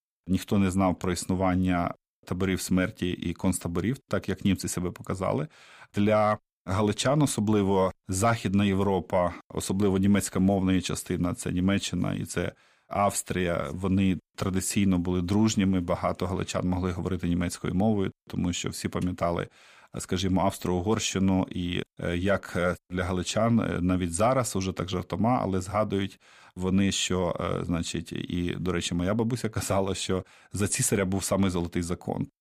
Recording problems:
none

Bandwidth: 15 kHz